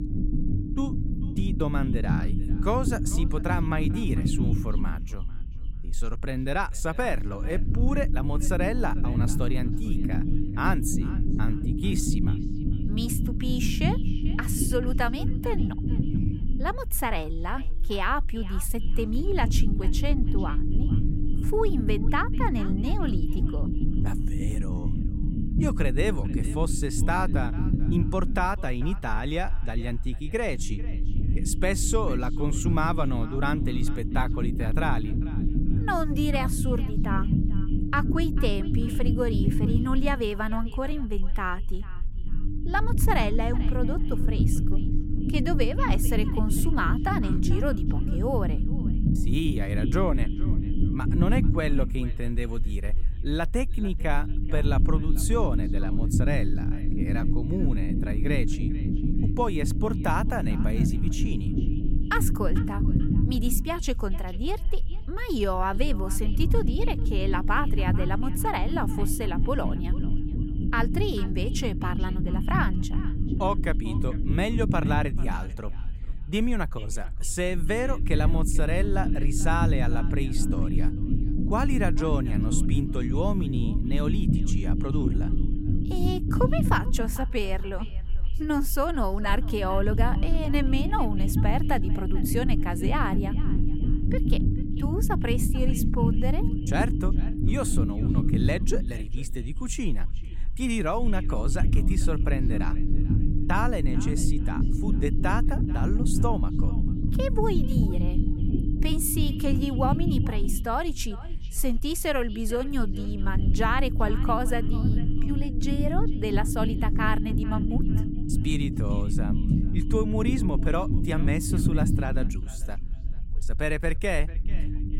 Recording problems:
echo of what is said; faint; throughout; 440 ms later, 20 dB below the speech
low rumble; loud; throughout; 6 dB below the speech

